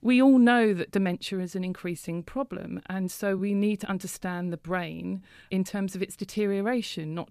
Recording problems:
uneven, jittery; strongly; from 0.5 to 6.5 s

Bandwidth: 14.5 kHz